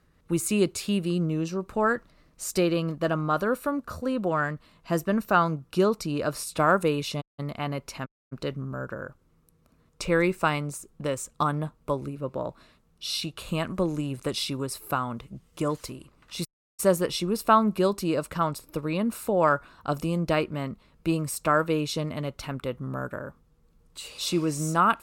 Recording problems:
audio cutting out; at 7 s, at 8 s and at 16 s

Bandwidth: 17 kHz